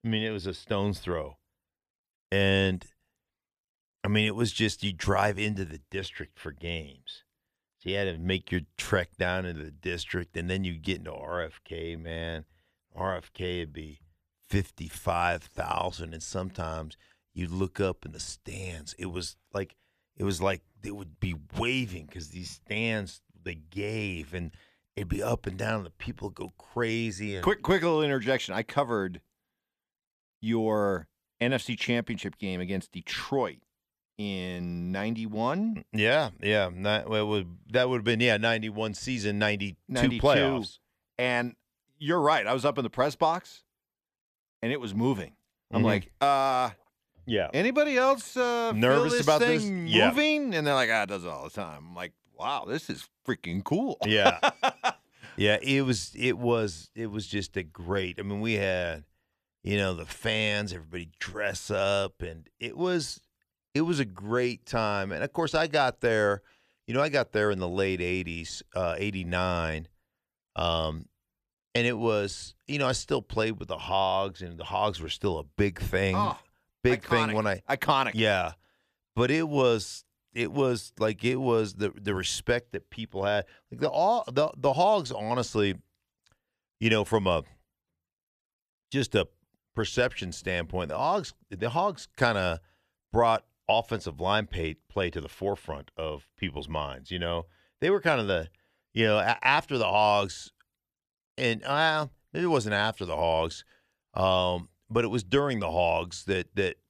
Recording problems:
none

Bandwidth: 14.5 kHz